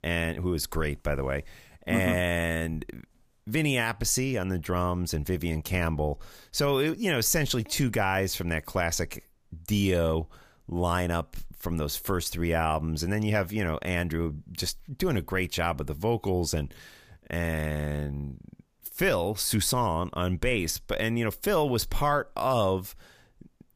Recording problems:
none

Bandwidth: 15 kHz